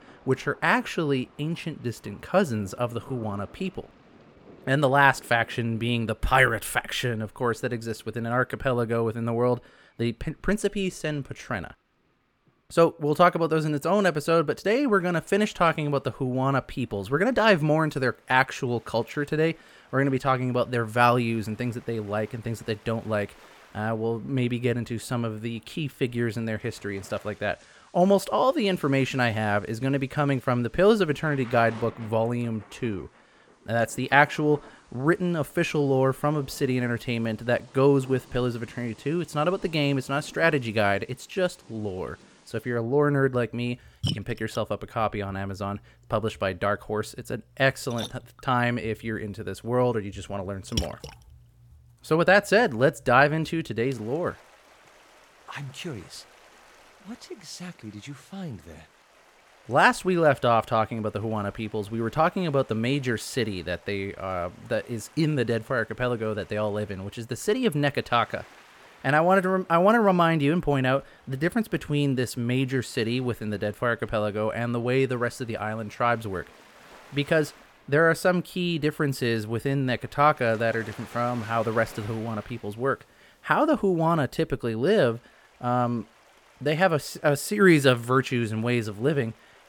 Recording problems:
rain or running water; faint; throughout; 25 dB below the speech

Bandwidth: 18 kHz